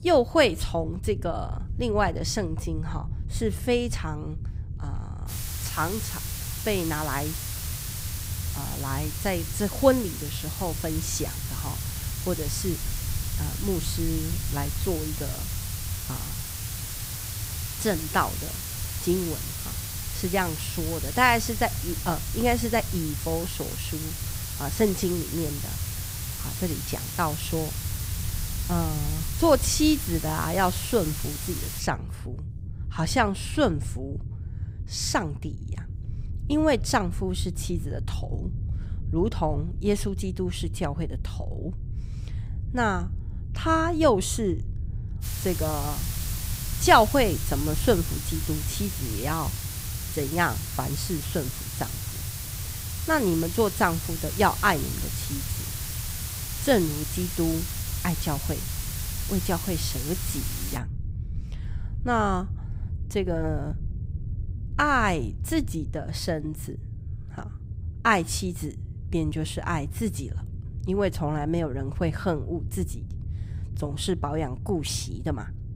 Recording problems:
hiss; loud; from 5.5 to 32 s and from 45 s to 1:01; 6 dB below the speech
low rumble; faint; throughout; 20 dB below the speech

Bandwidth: 15.5 kHz